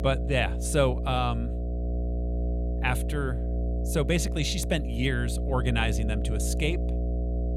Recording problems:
electrical hum; noticeable; throughout; 60 Hz, 10 dB below the speech

